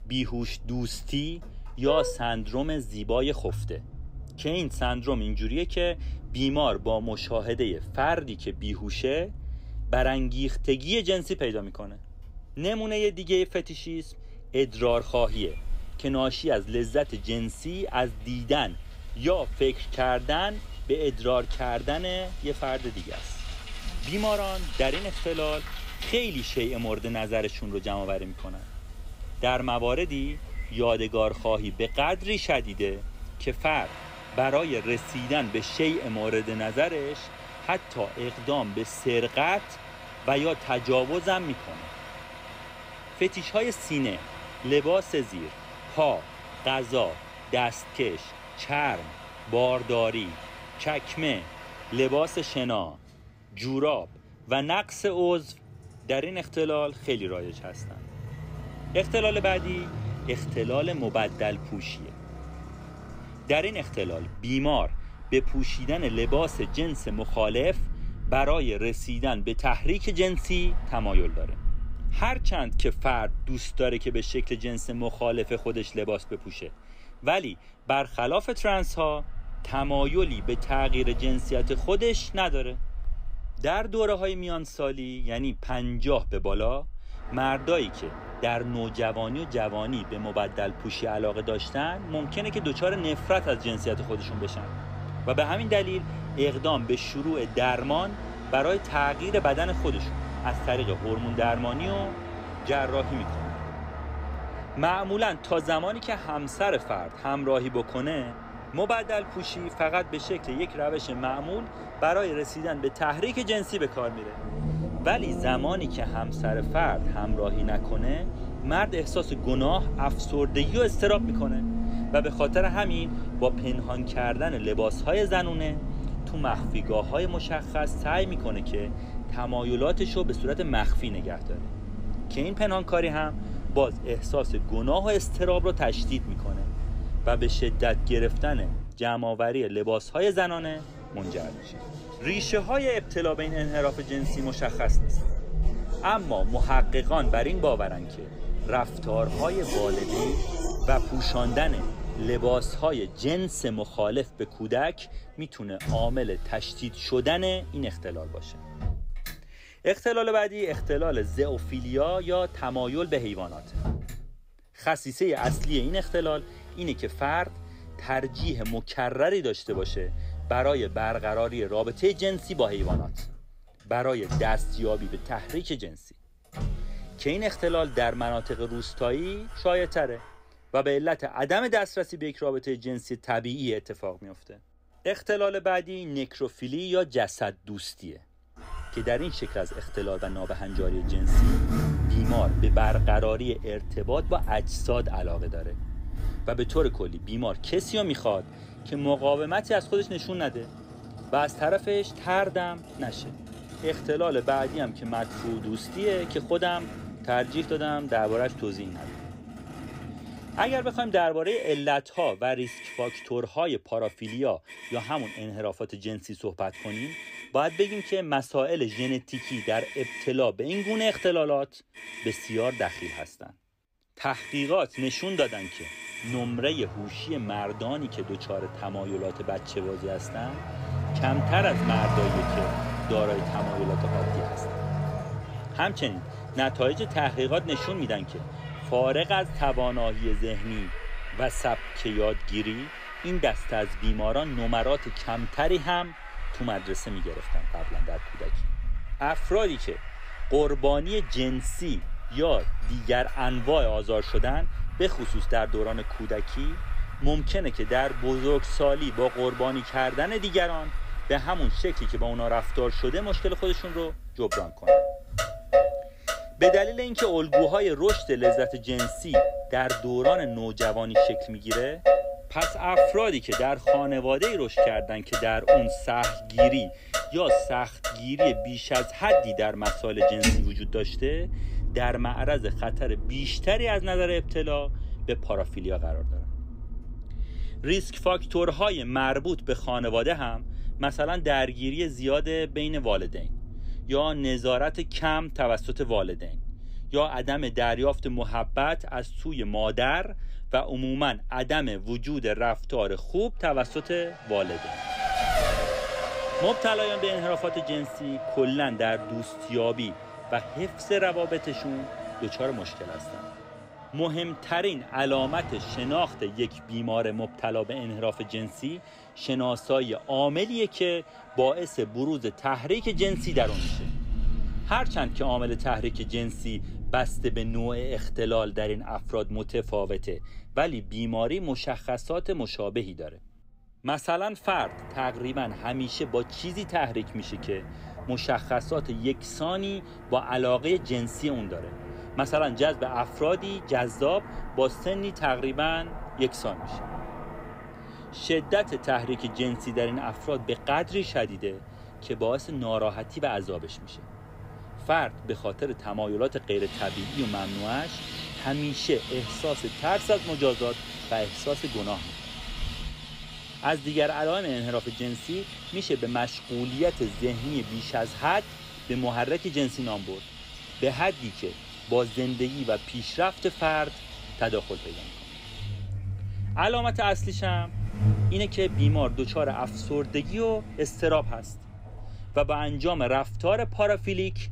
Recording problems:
traffic noise; loud; throughout; 6 dB below the speech

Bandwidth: 15.5 kHz